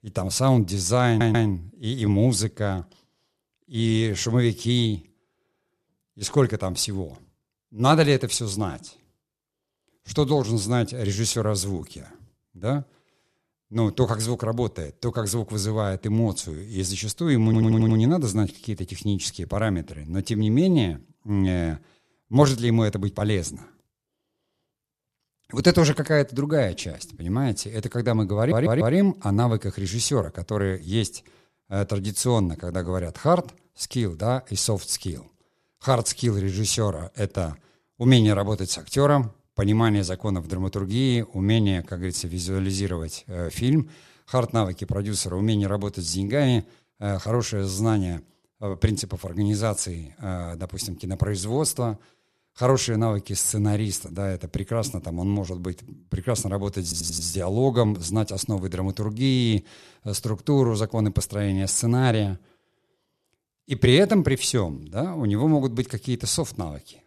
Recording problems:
audio stuttering; 4 times, first at 1 s

